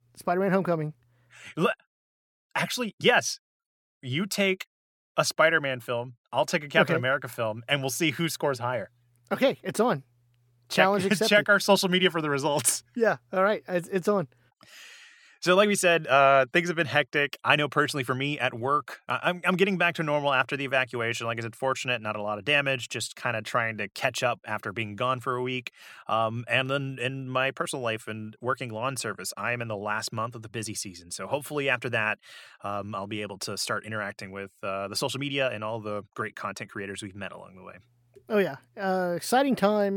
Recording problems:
abrupt cut into speech; at the end

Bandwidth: 18 kHz